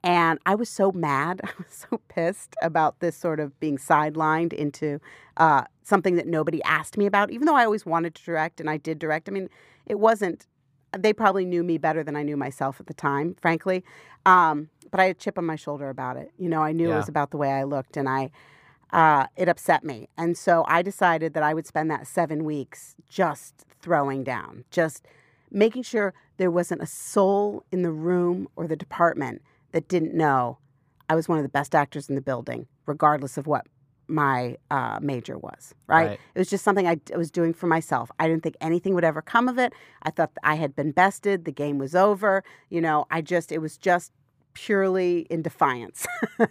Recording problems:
muffled; slightly; fading above 2.5 kHz

